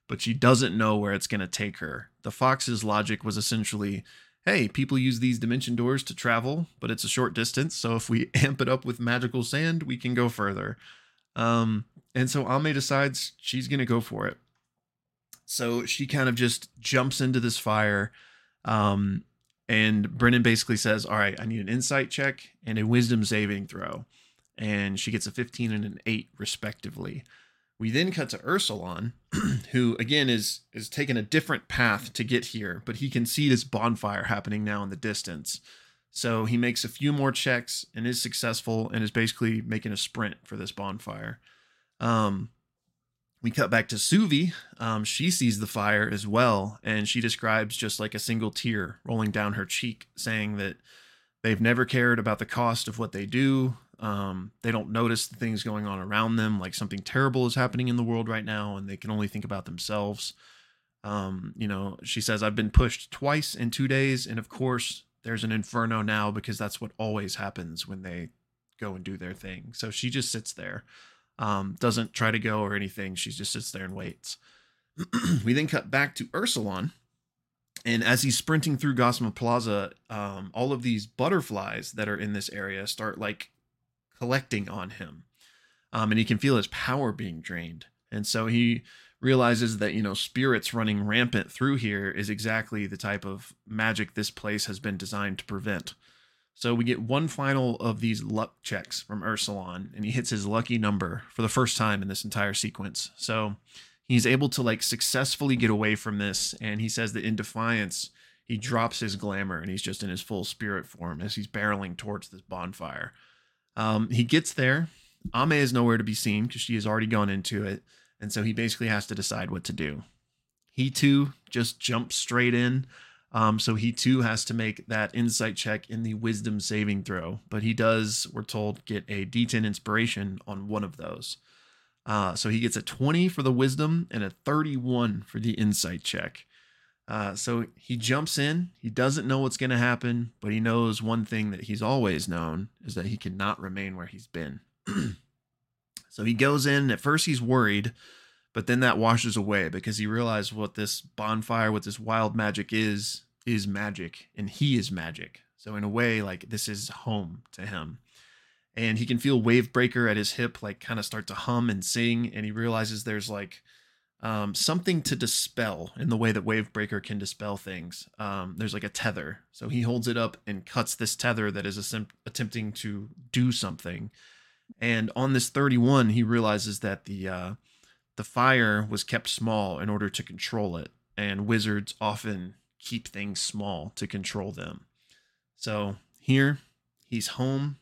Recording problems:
none

